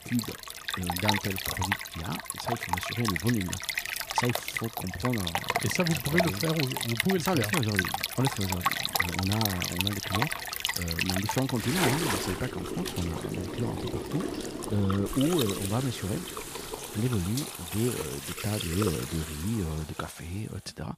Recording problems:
rain or running water; very loud; throughout; as loud as the speech

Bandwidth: 15 kHz